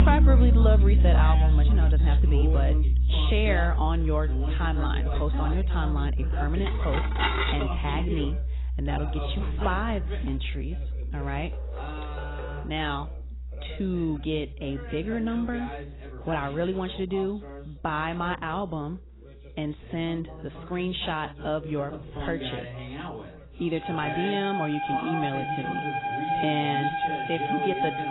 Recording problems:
garbled, watery; badly; nothing above 4 kHz
background music; very loud; throughout; 4 dB above the speech
background chatter; loud; throughout; 2 voices, 8 dB below the speech
clattering dishes; loud; at 6.5 s; peak 5 dB above the speech
door banging; faint; from 12 to 13 s; peak 10 dB below the speech

